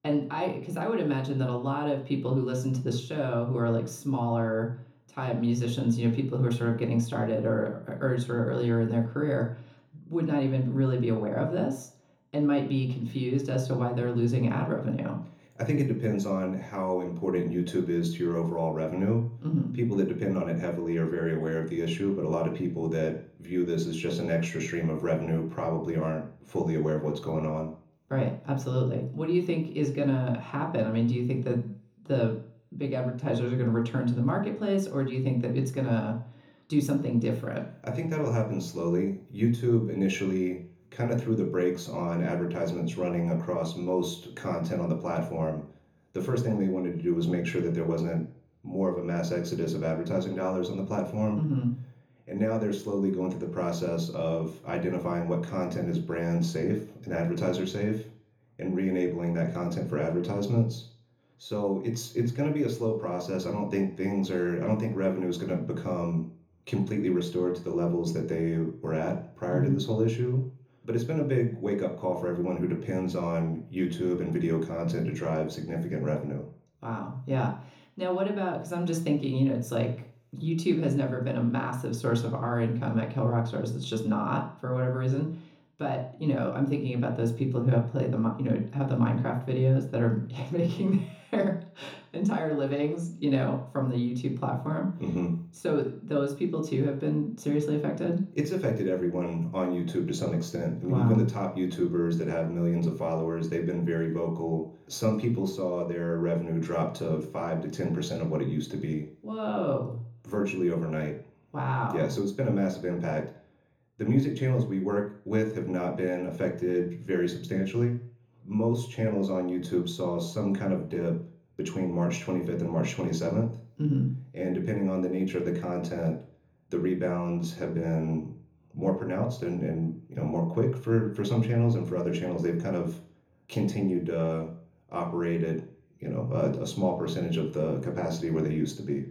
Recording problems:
off-mic speech; far
room echo; slight; dies away in 0.6 s

